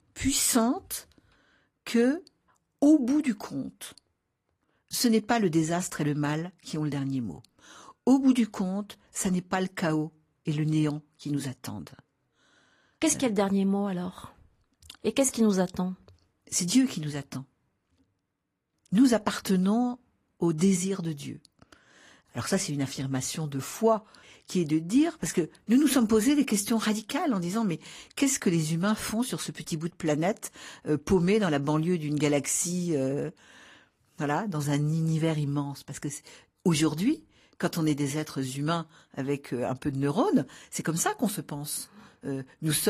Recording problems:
garbled, watery; slightly; nothing above 14.5 kHz
abrupt cut into speech; at the end

